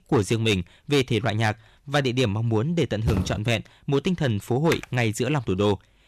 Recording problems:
distortion; slight; 4% of the sound clipped
footsteps; noticeable; at 3 s; peak 4 dB below the speech
keyboard typing; noticeable; at 4.5 s; peak 9 dB below the speech

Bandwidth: 13.5 kHz